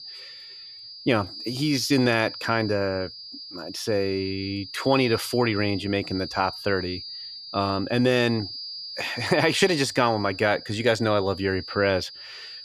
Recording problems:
high-pitched whine; noticeable; throughout; 5 kHz, 10 dB below the speech

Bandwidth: 14.5 kHz